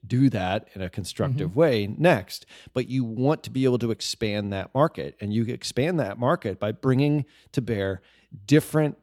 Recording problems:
none

